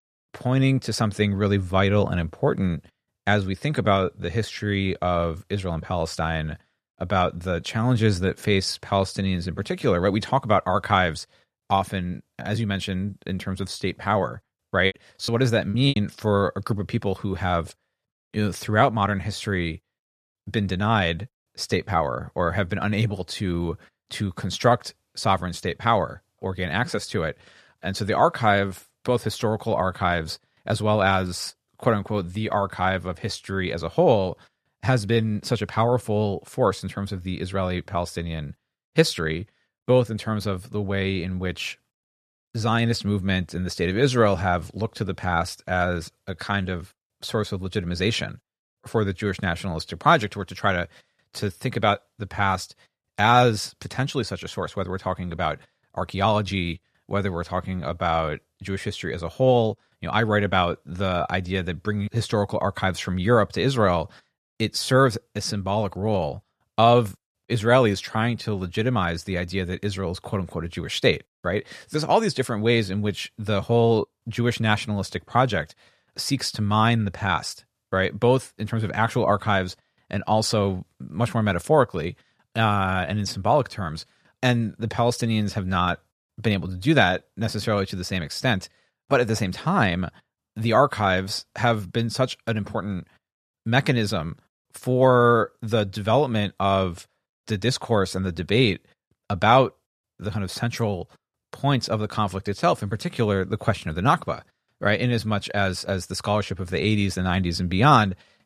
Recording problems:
choppy; very; from 15 to 16 s; 14% of the speech affected

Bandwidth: 14 kHz